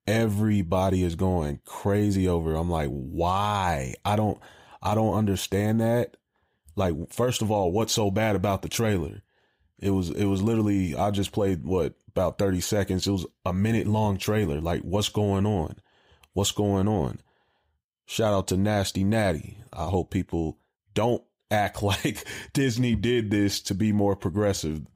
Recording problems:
none

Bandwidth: 15.5 kHz